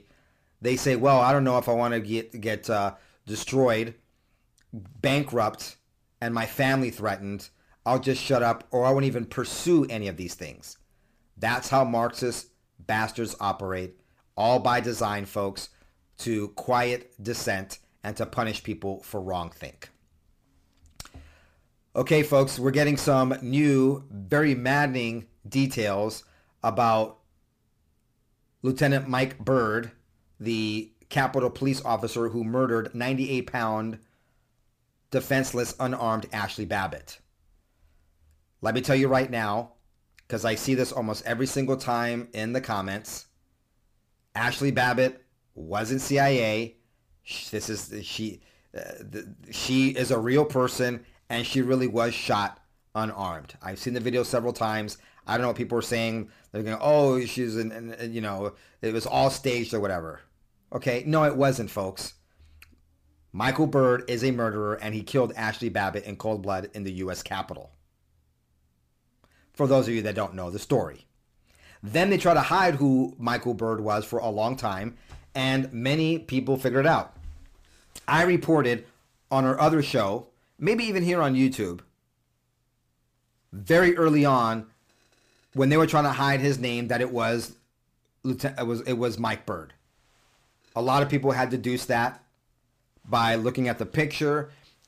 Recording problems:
distortion; slight; 10 dB below the speech

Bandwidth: 15 kHz